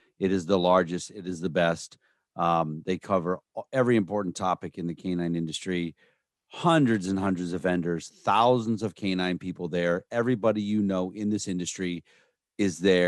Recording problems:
abrupt cut into speech; at the end

